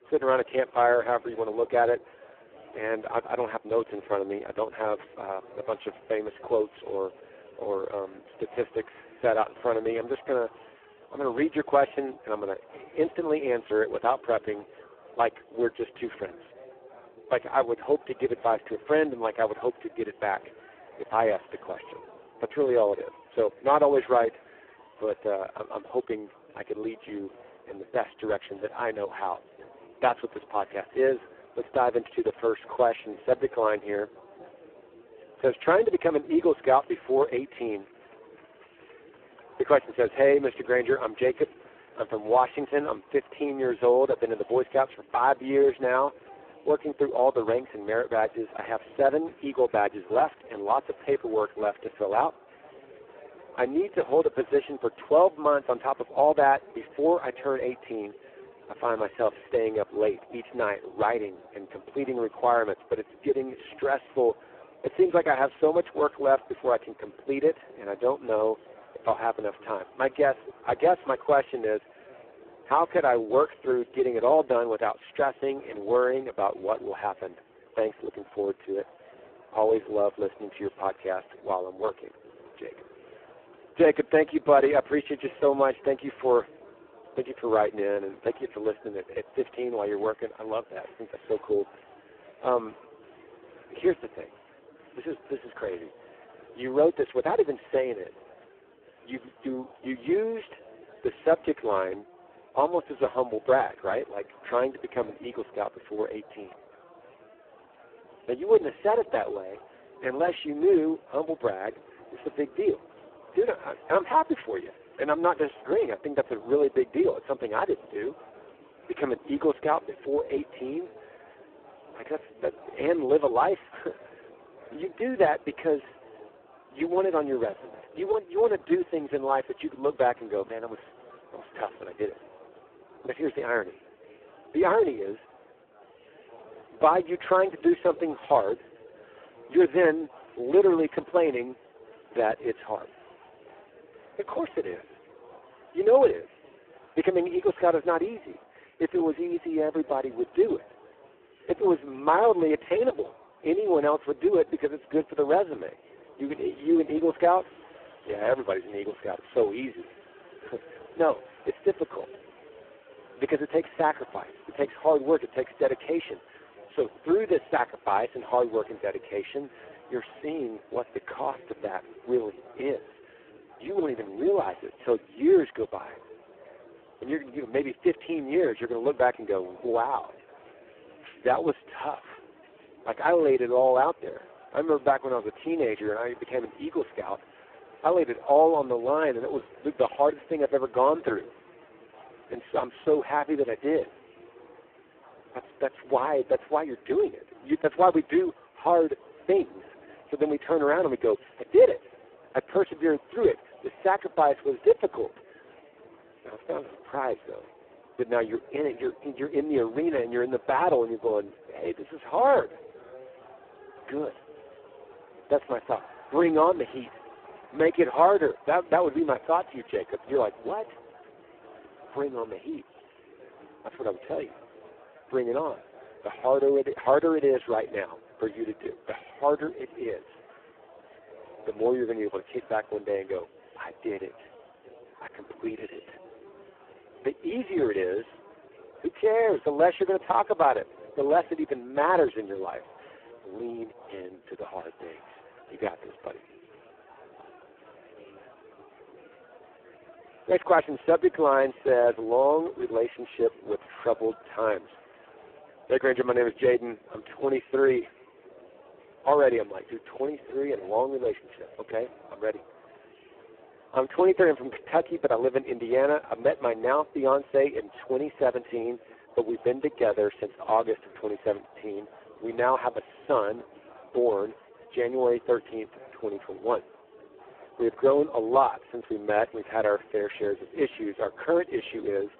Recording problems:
phone-call audio; poor line; nothing above 3.5 kHz
chatter from many people; faint; throughout; 25 dB below the speech

